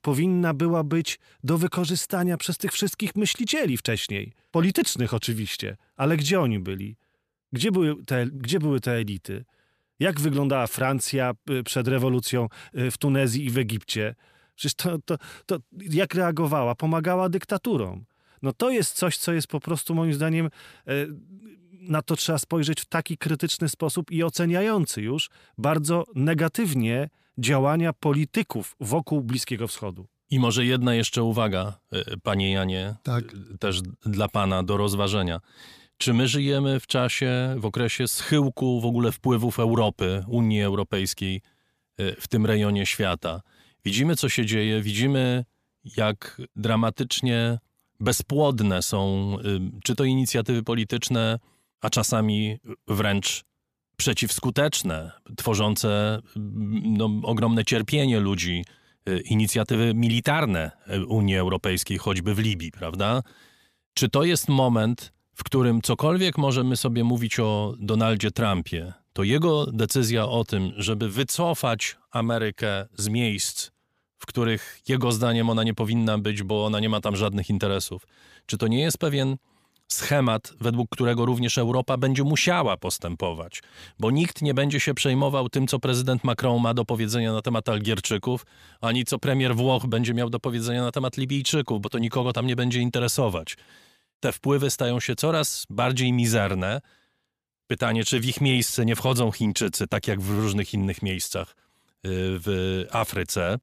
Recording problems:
none

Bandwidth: 14.5 kHz